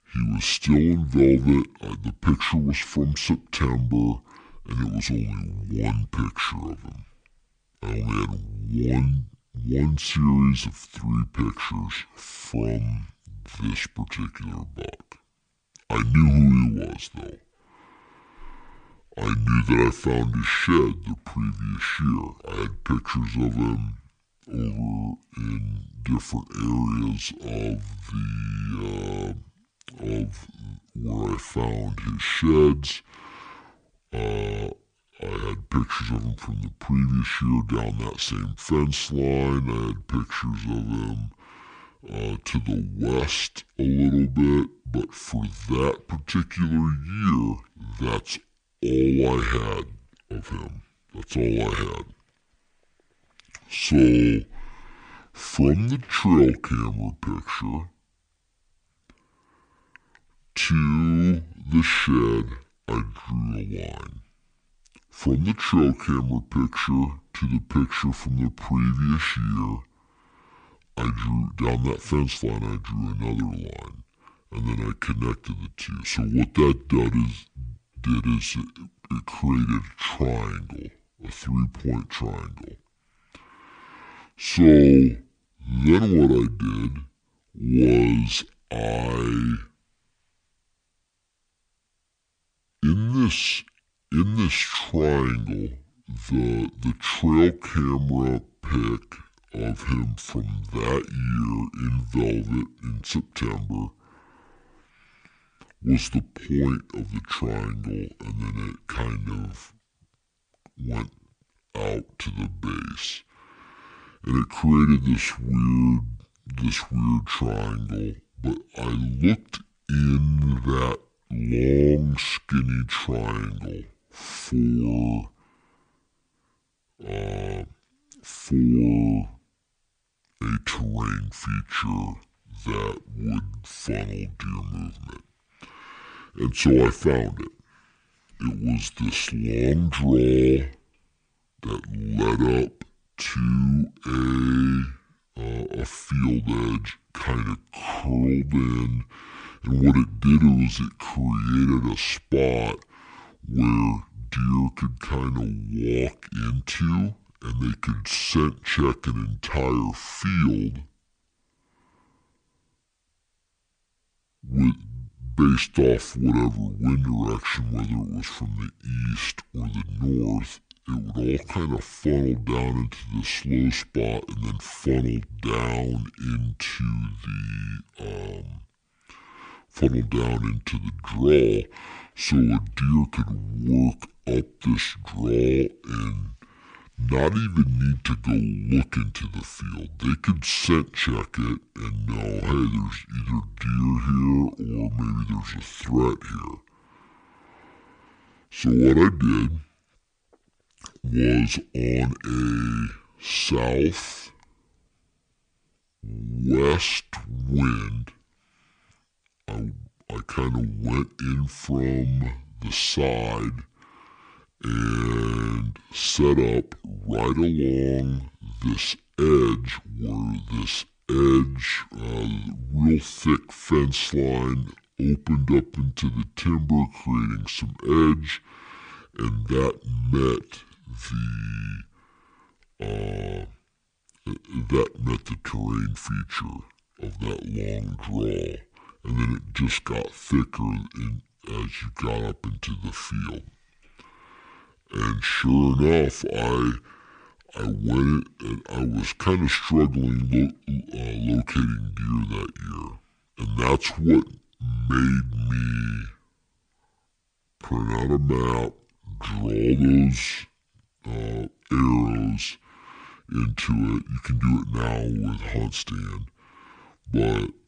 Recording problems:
wrong speed and pitch; too slow and too low; 0.6 times normal speed

